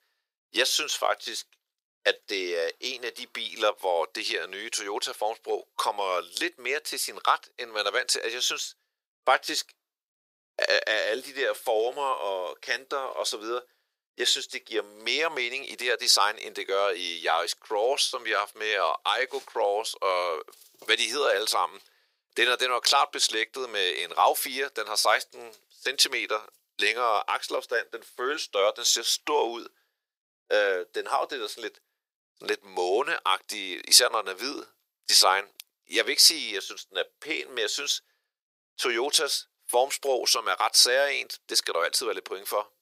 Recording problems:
thin; very; fading below 400 Hz

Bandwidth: 15.5 kHz